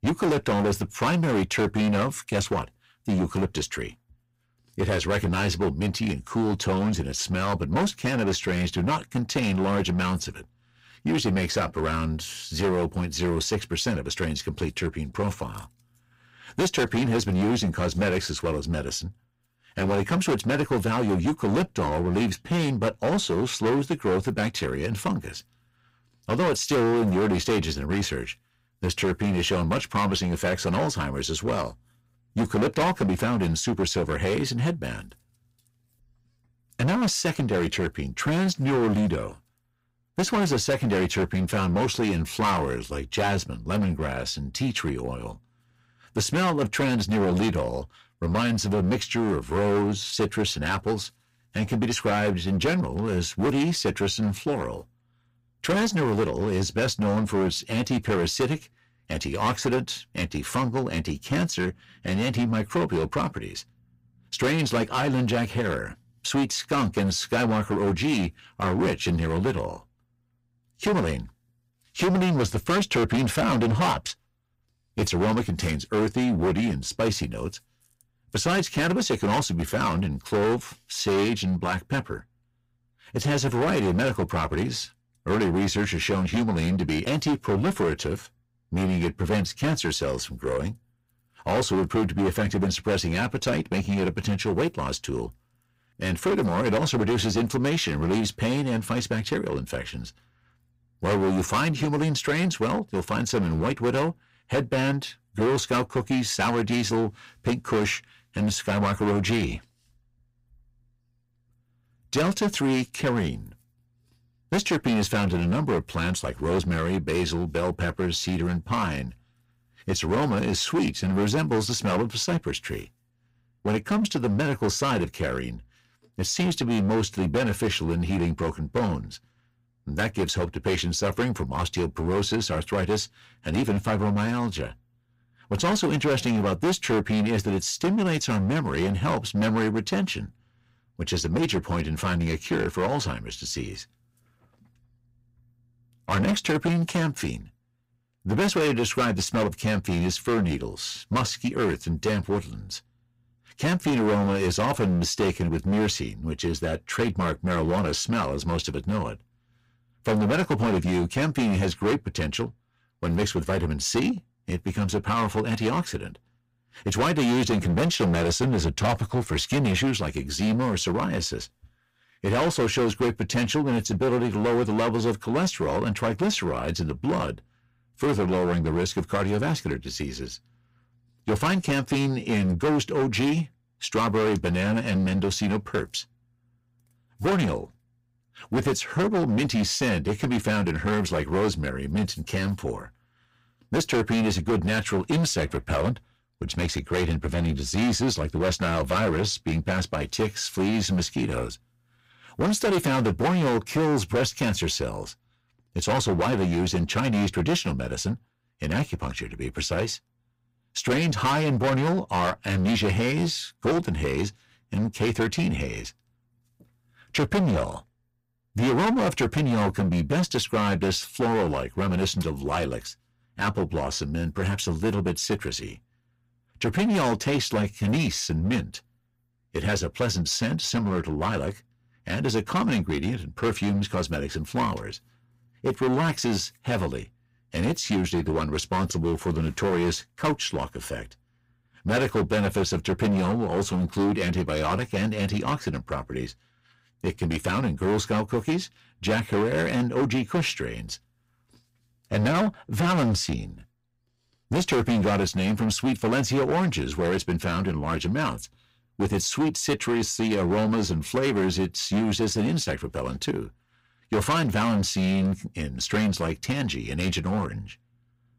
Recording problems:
distortion; heavy; 14% of the sound clipped

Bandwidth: 15.5 kHz